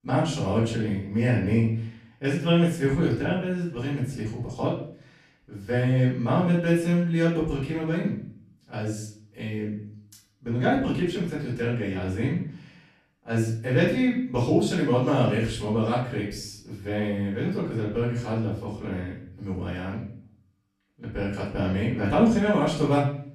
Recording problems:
off-mic speech; far
room echo; noticeable; dies away in 0.5 s

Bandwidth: 14 kHz